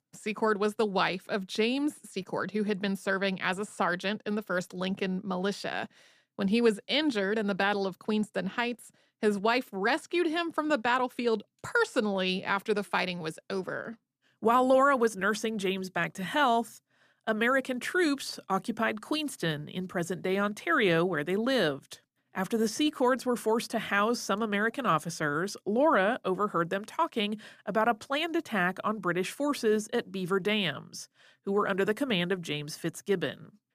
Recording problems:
none

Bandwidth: 14.5 kHz